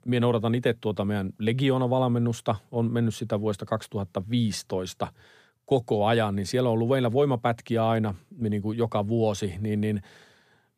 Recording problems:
none

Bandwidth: 15 kHz